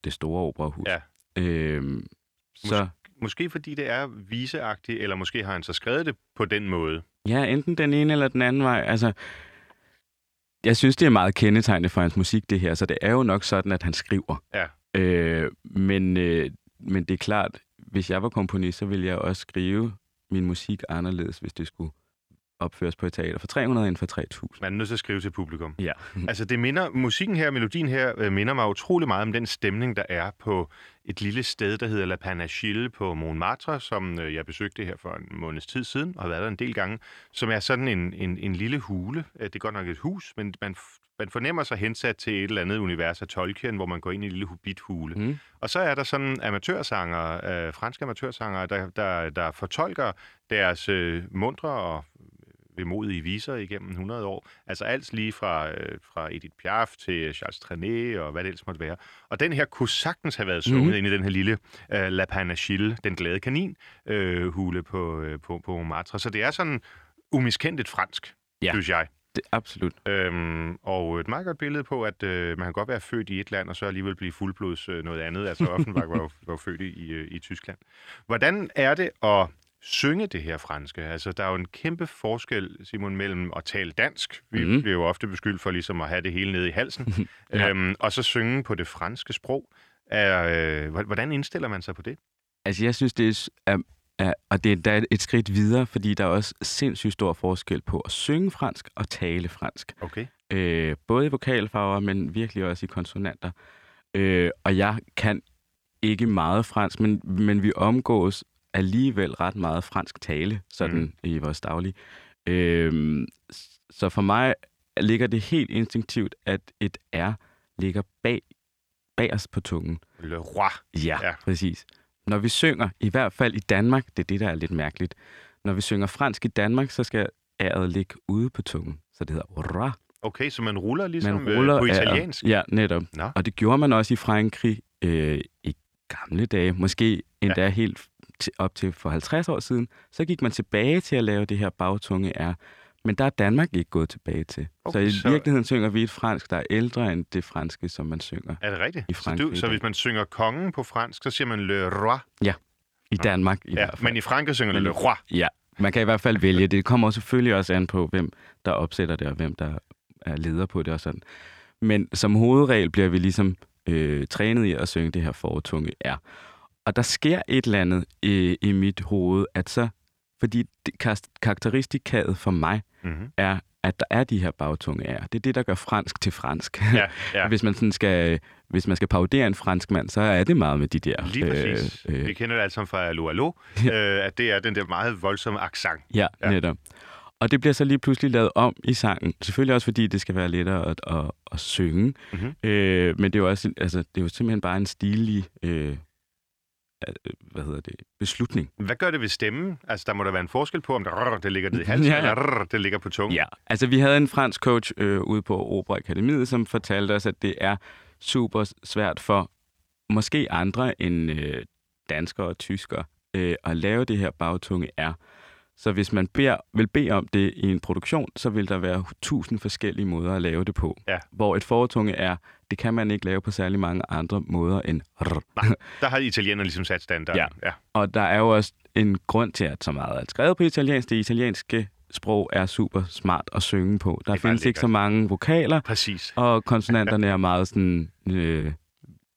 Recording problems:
none

